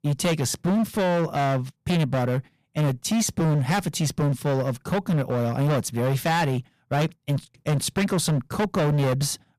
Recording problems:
distortion; heavy; 22% of the sound clipped

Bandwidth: 15 kHz